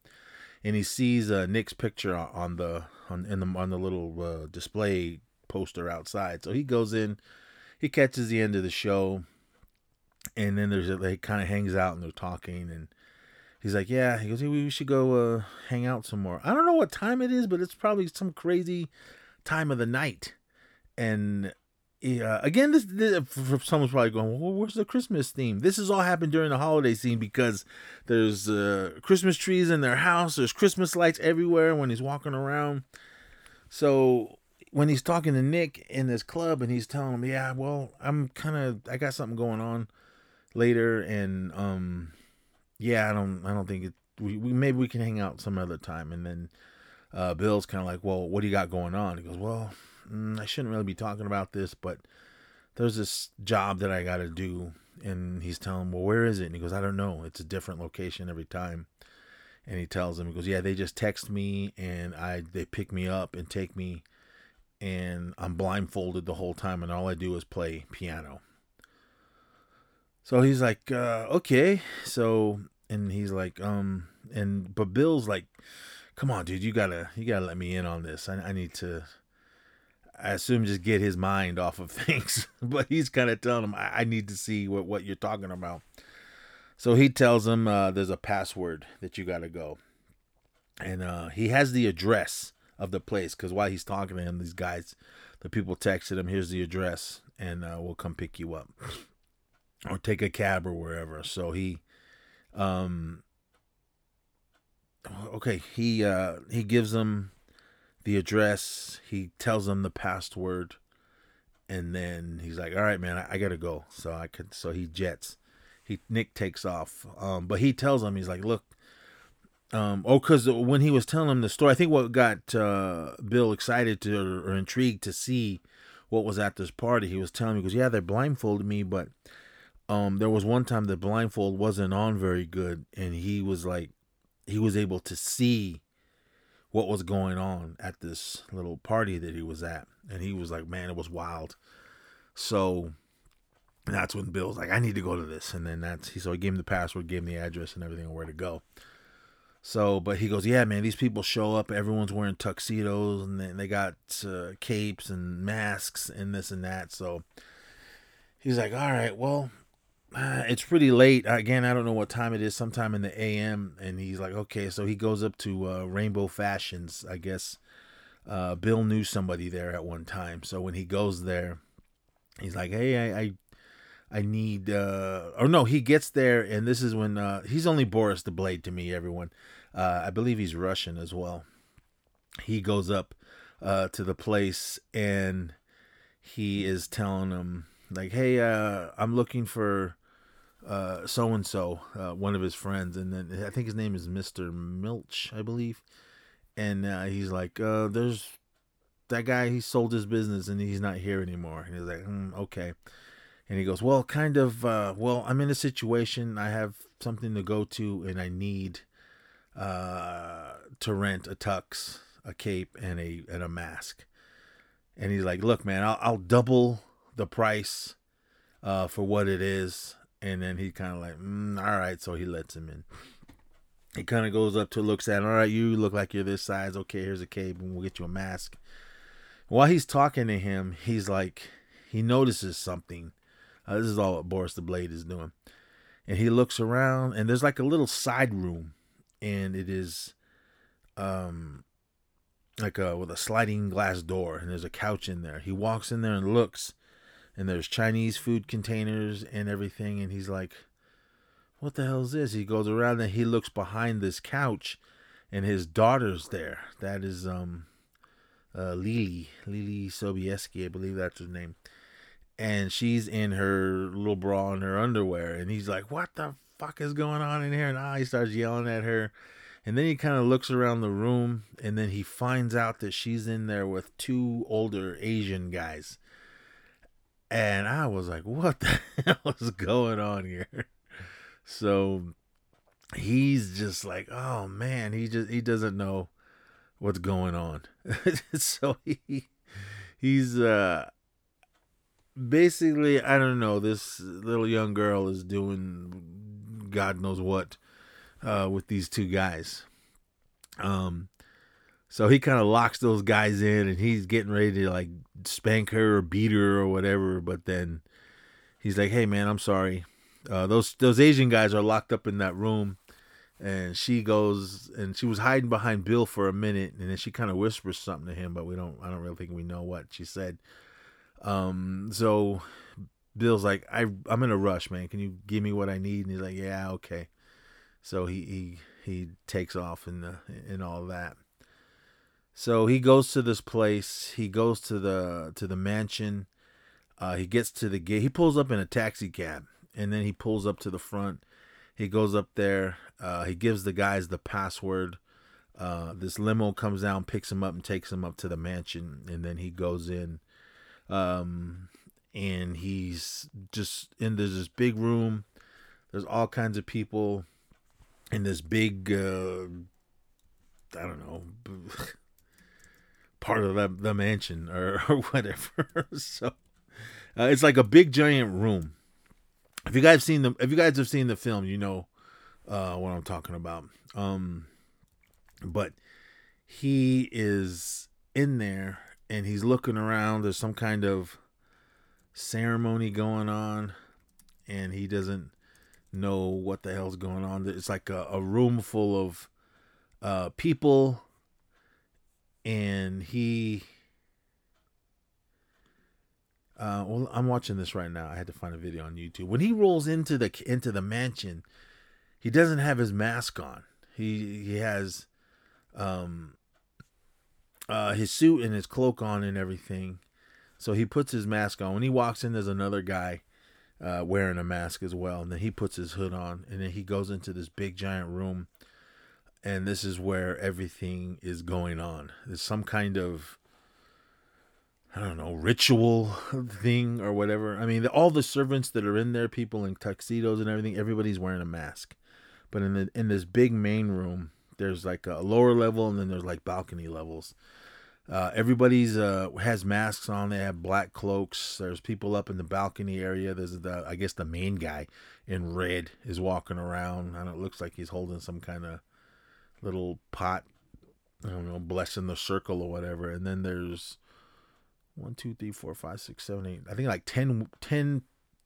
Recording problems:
none

